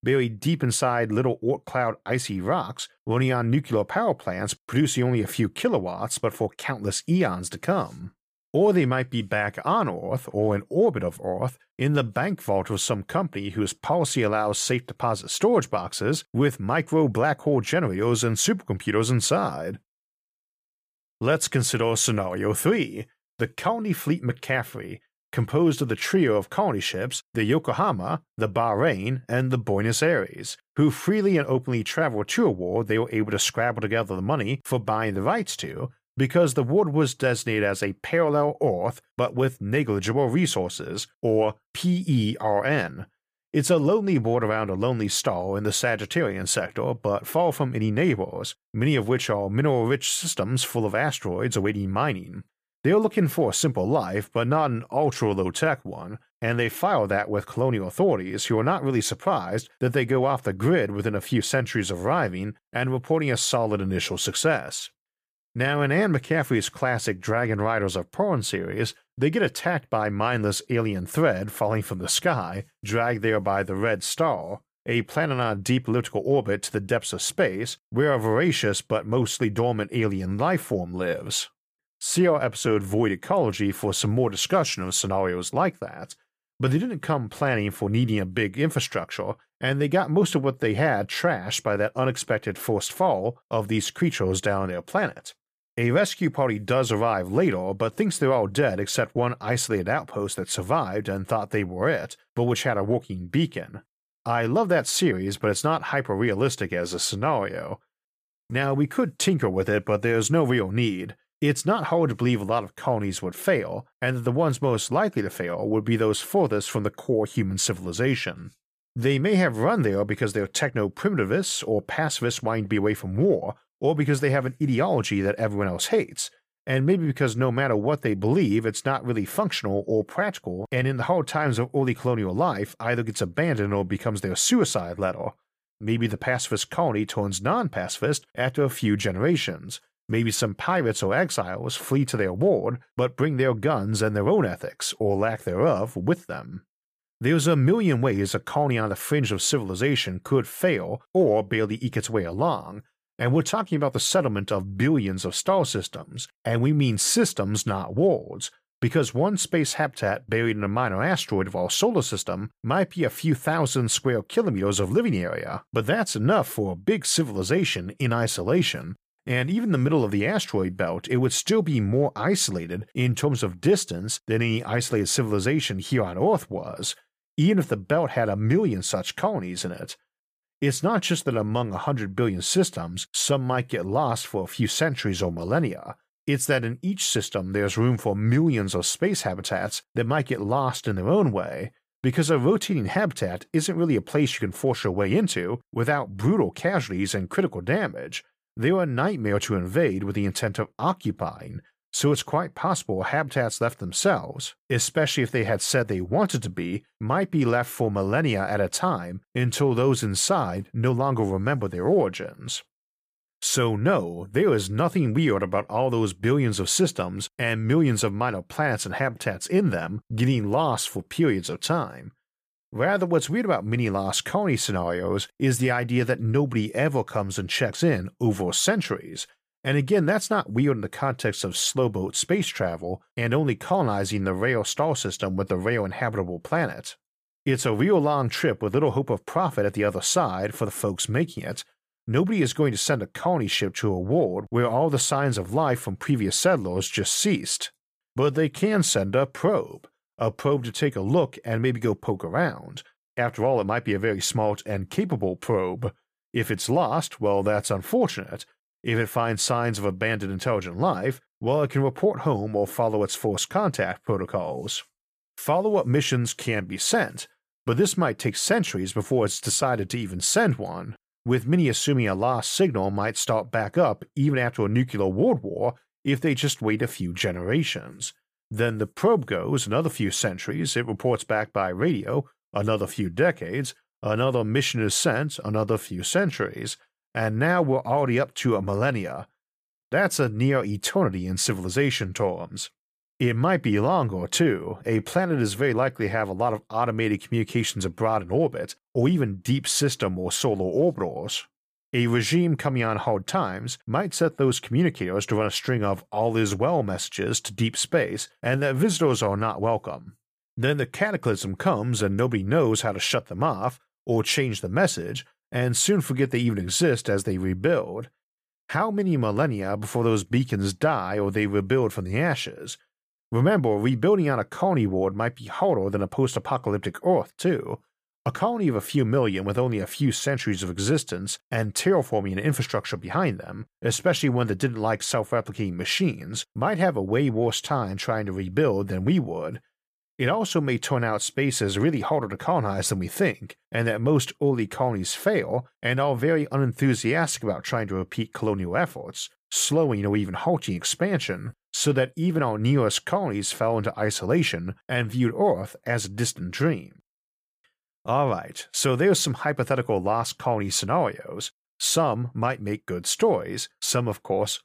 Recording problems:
none

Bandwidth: 15 kHz